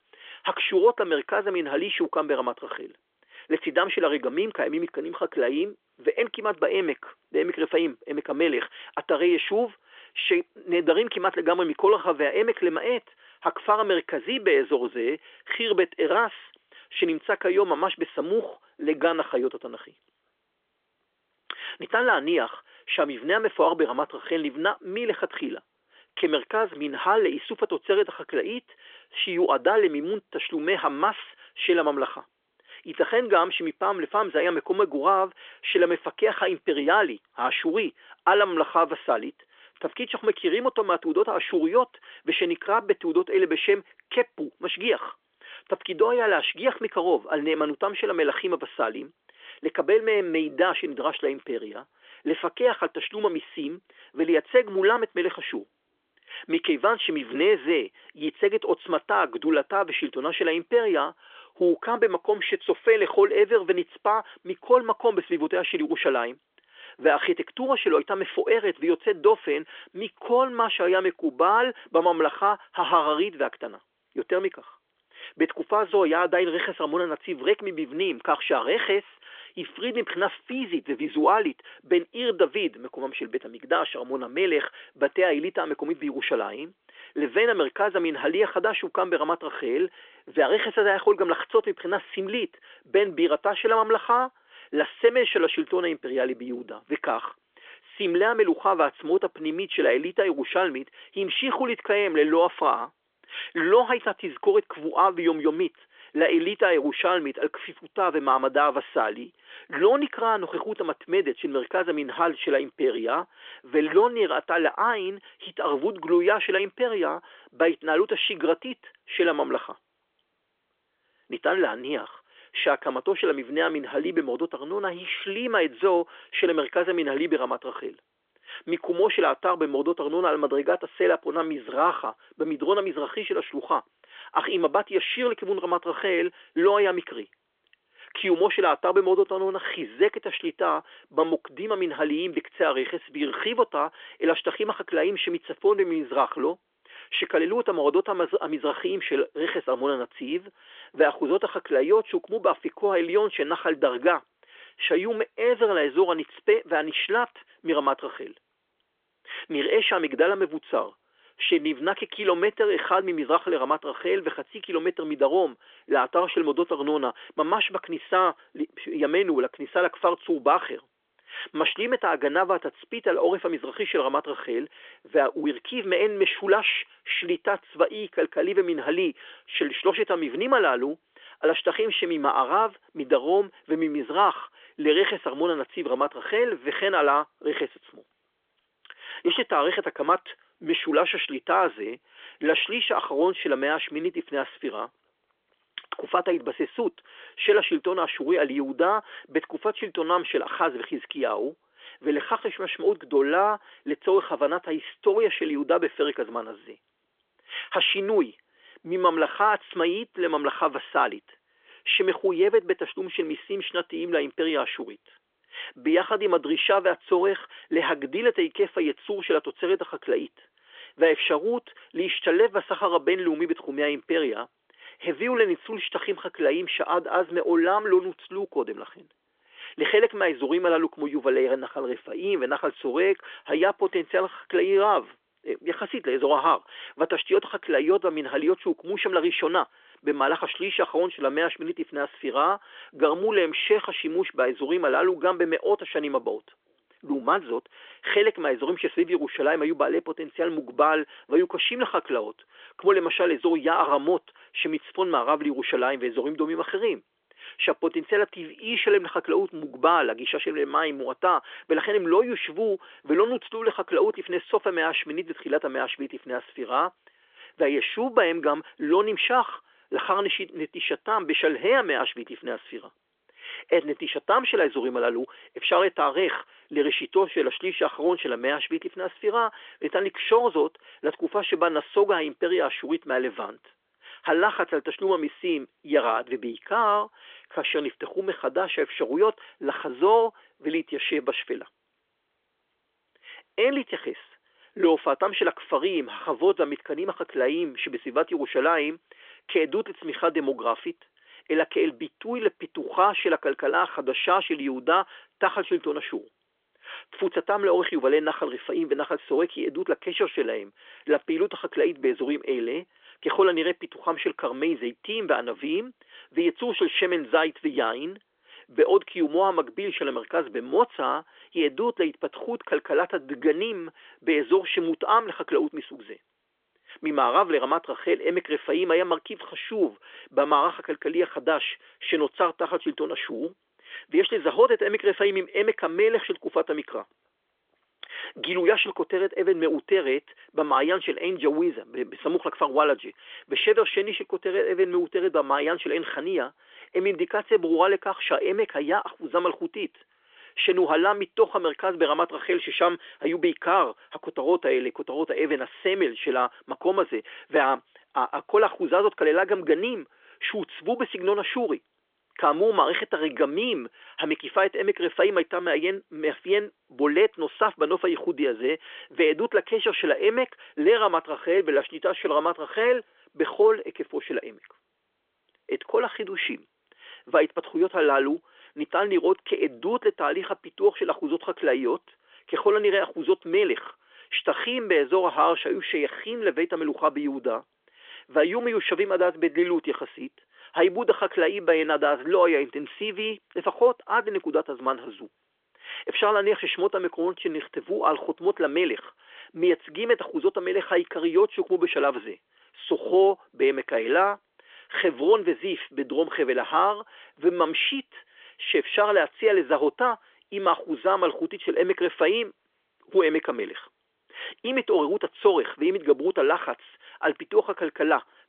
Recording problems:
phone-call audio; nothing above 3.5 kHz

